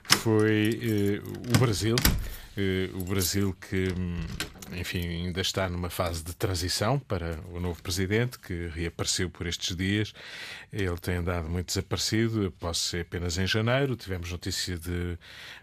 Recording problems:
household noises; loud; throughout; 2 dB below the speech

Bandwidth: 14.5 kHz